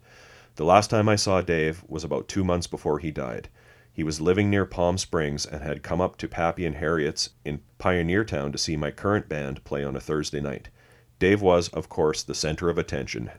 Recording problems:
none

